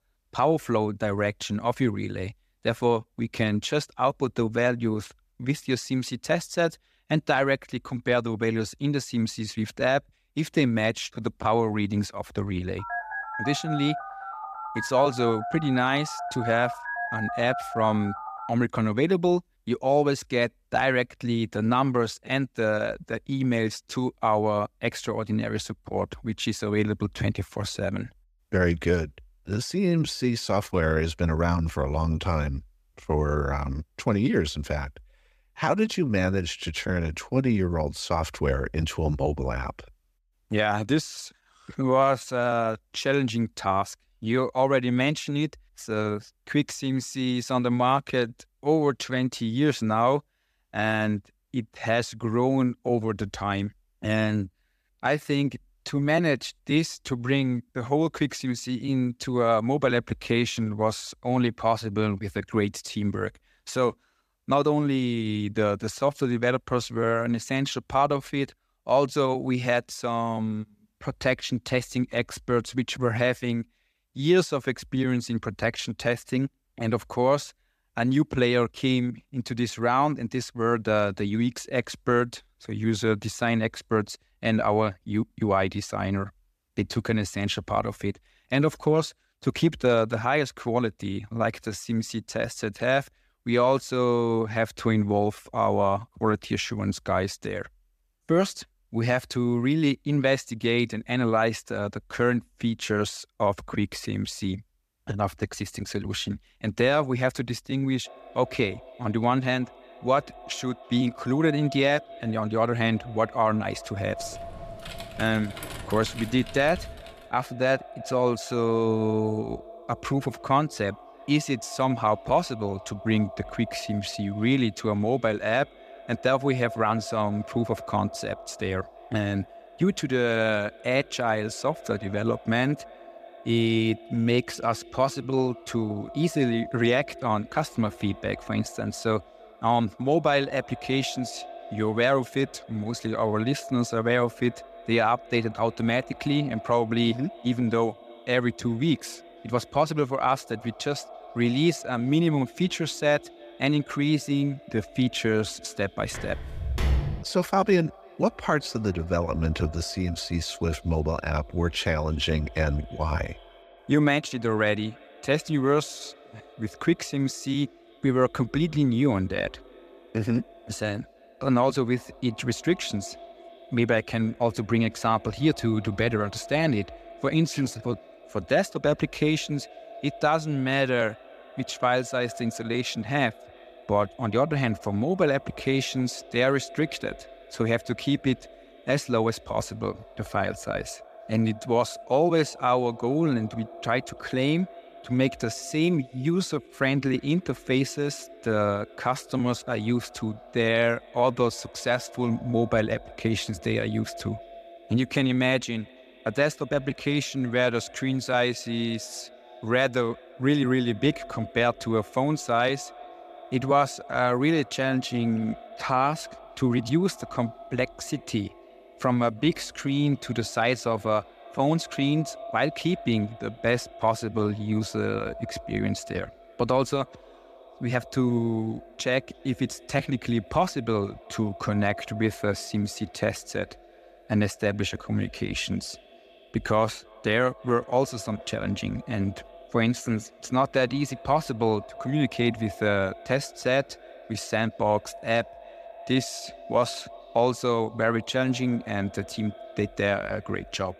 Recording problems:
echo of what is said; faint; from 1:48 on; 340 ms later, 20 dB below the speech
phone ringing; noticeable; from 13 to 18 s; peak 4 dB below the speech
keyboard typing; faint; from 1:54 to 1:57; peak 10 dB below the speech
footsteps; loud; from 2:36 to 2:37; peak level with the speech

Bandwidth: 14.5 kHz